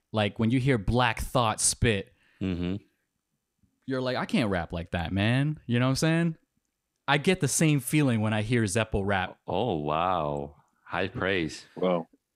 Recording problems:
none

